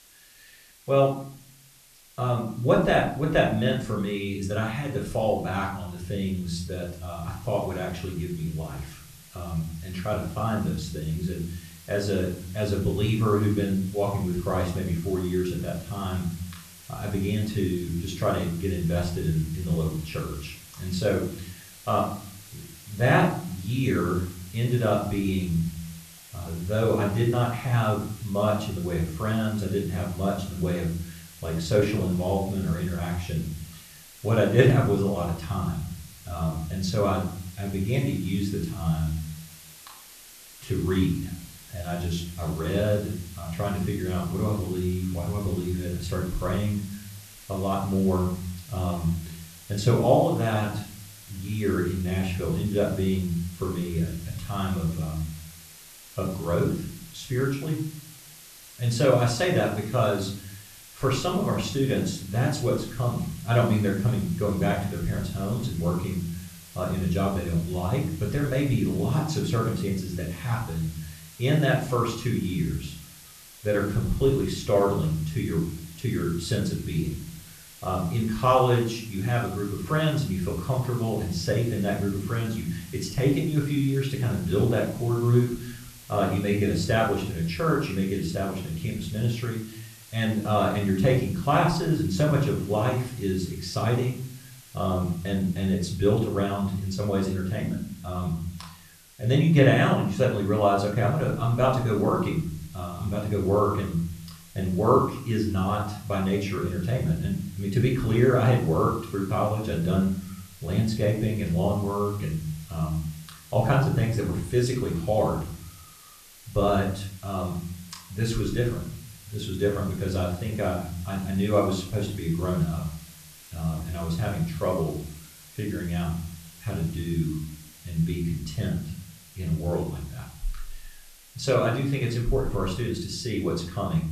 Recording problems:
off-mic speech; far
room echo; slight; dies away in 0.6 s
hiss; noticeable; throughout; 20 dB below the speech

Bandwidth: 14 kHz